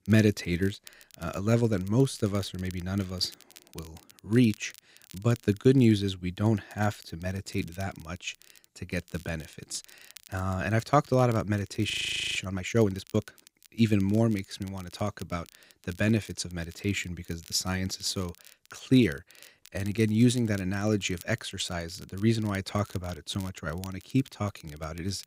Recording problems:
crackle, like an old record; faint; 25 dB below the speech
audio freezing; at 12 s

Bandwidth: 15.5 kHz